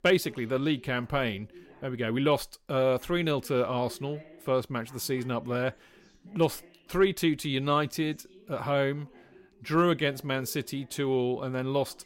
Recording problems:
voice in the background; faint; throughout; 25 dB below the speech

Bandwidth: 16 kHz